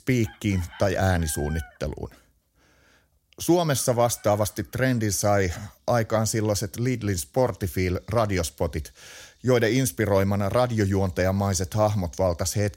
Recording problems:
animal sounds; faint; throughout; 25 dB below the speech

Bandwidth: 16 kHz